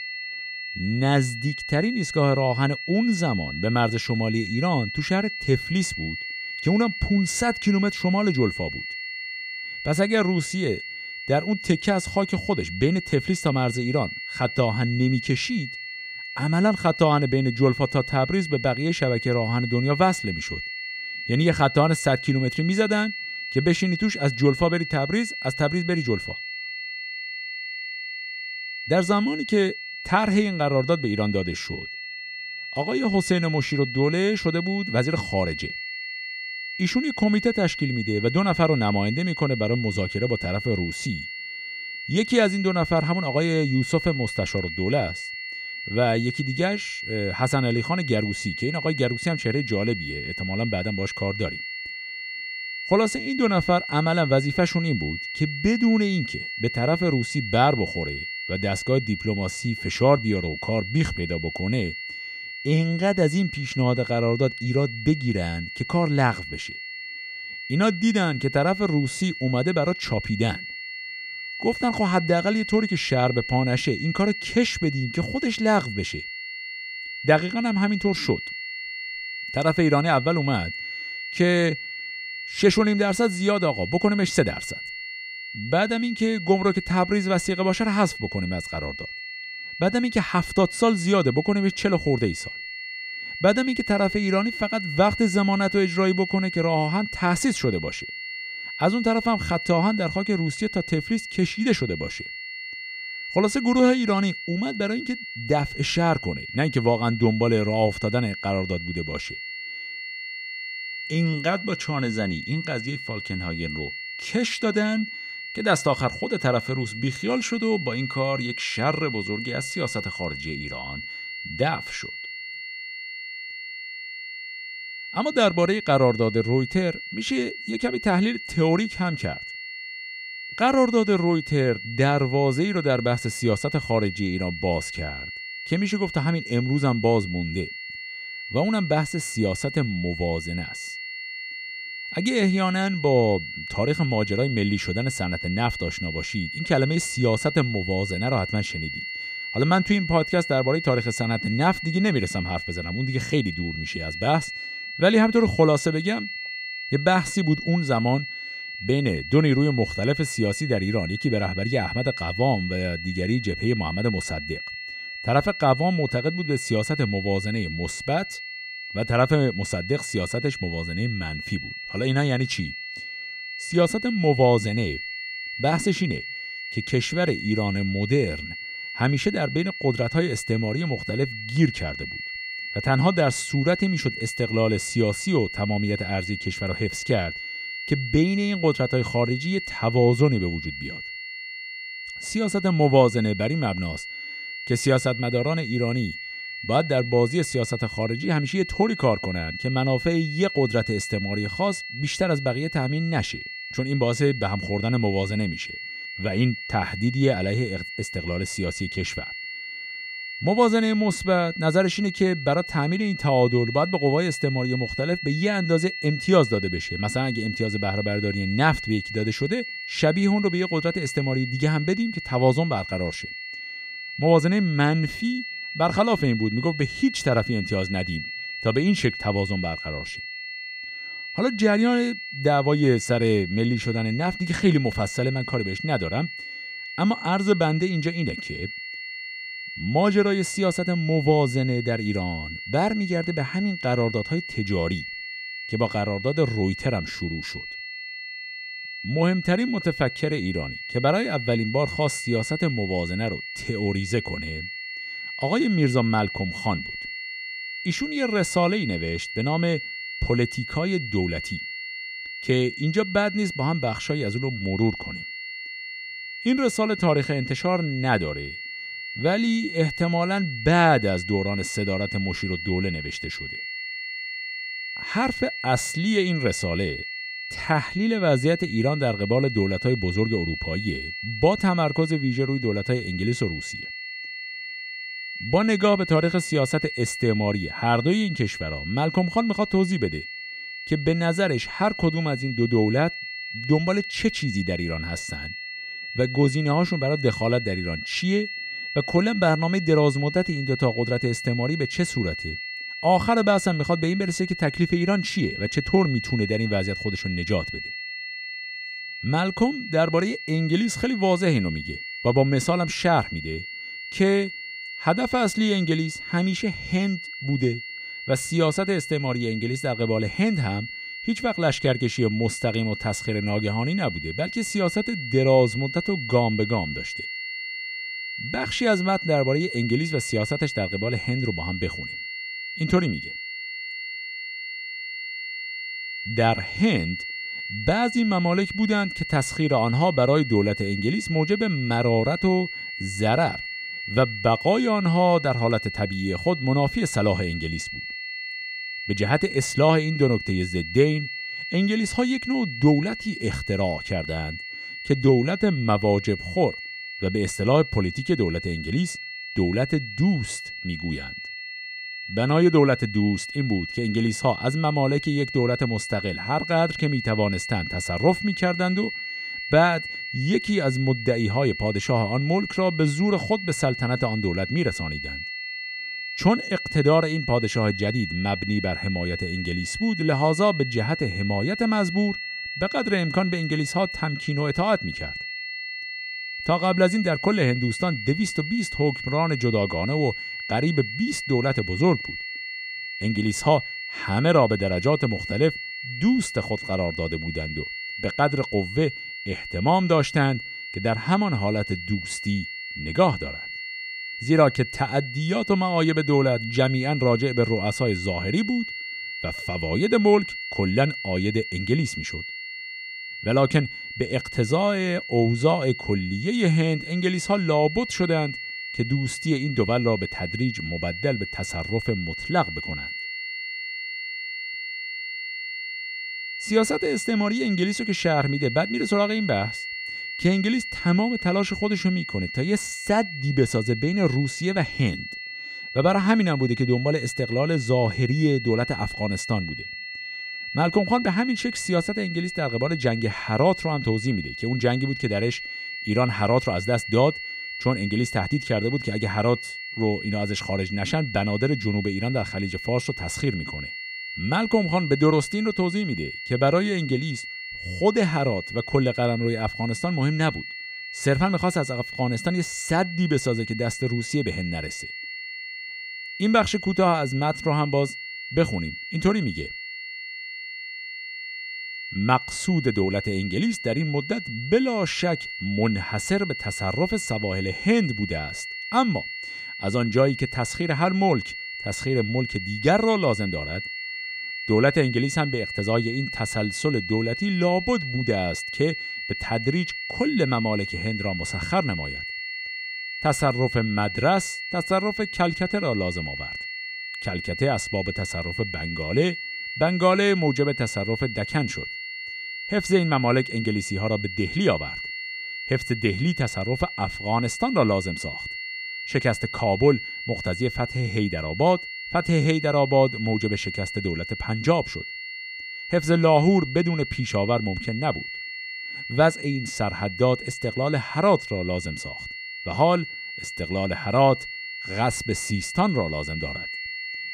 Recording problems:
high-pitched whine; loud; throughout; 2 kHz, 8 dB below the speech

